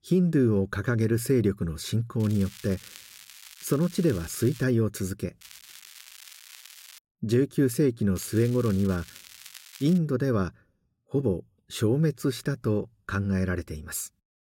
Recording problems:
crackling; noticeable; from 2 to 4.5 s, from 5.5 to 7 s and from 8 to 10 s; 20 dB below the speech

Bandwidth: 16 kHz